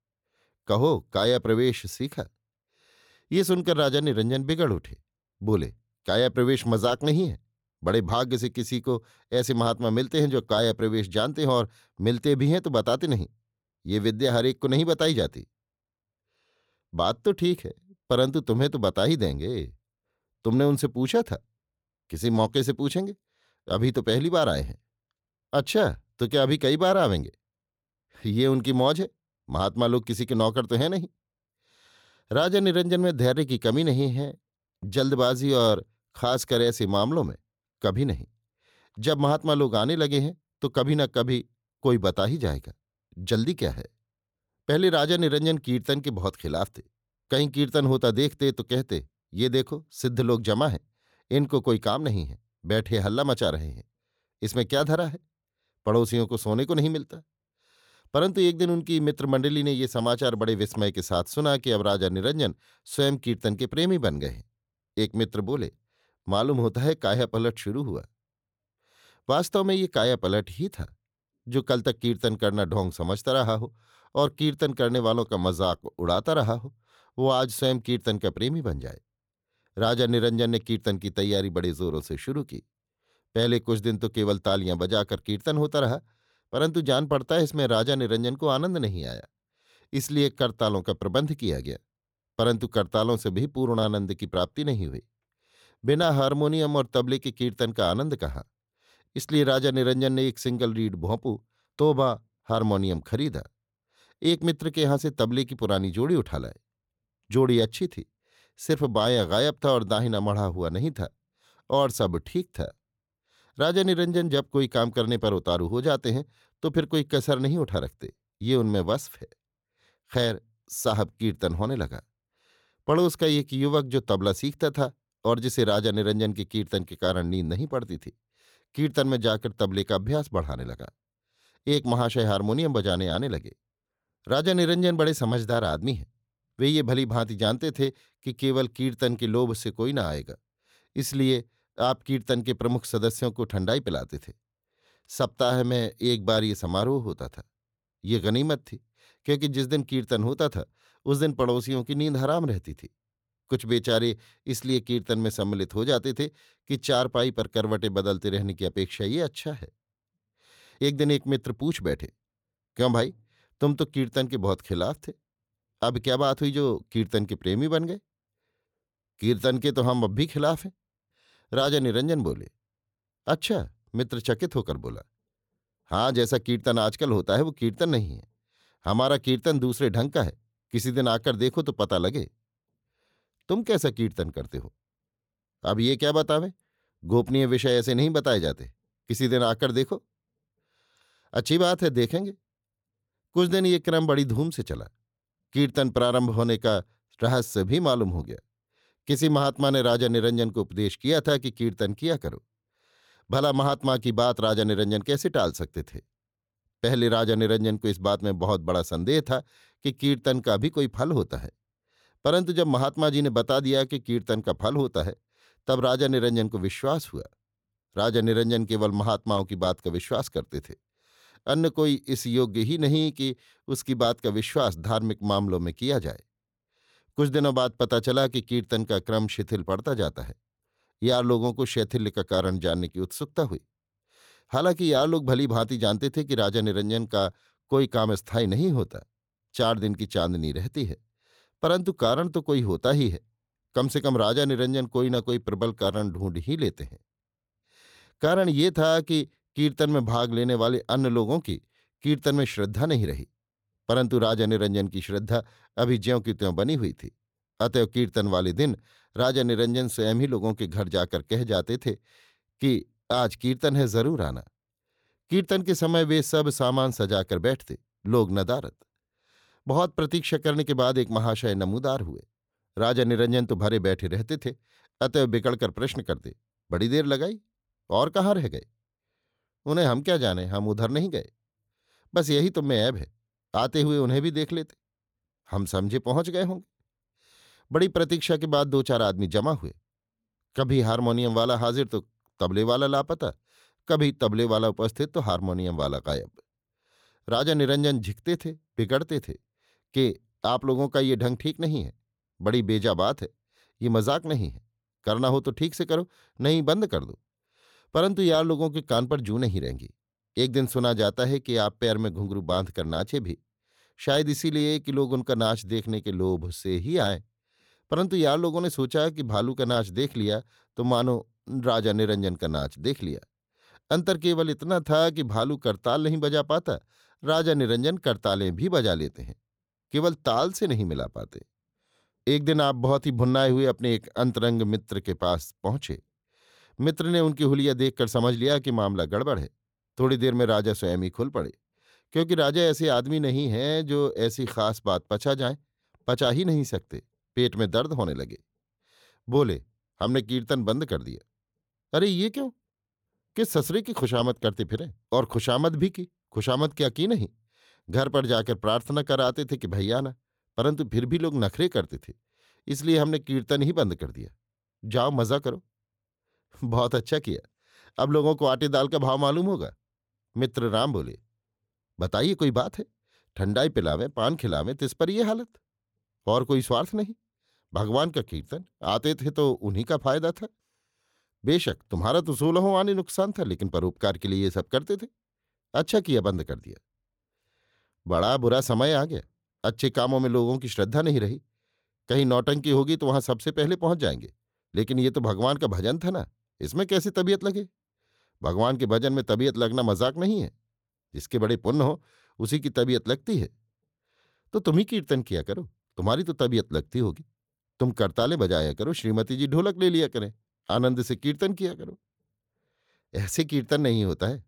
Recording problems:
none

